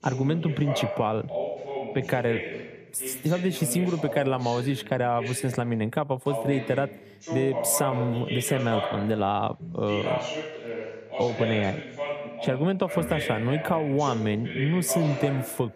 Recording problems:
voice in the background; loud; throughout; 6 dB below the speech

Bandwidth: 15 kHz